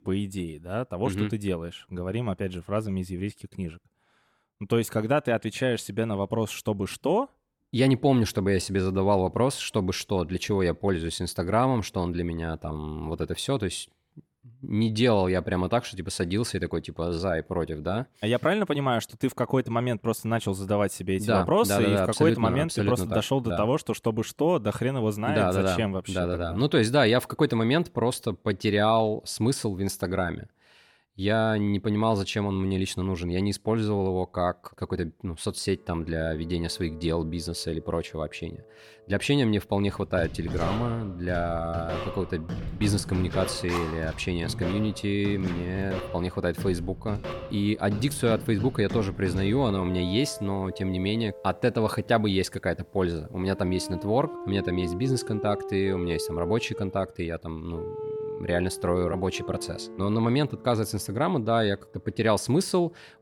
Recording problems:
background music; noticeable; from 36 s on; 10 dB below the speech

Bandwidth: 17.5 kHz